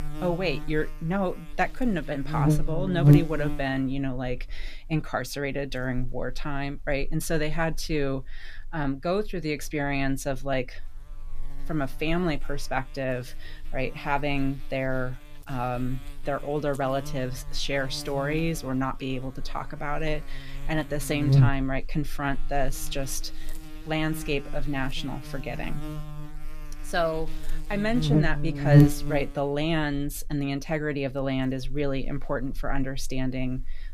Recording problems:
electrical hum; loud; throughout; 60 Hz, 6 dB below the speech

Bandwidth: 14.5 kHz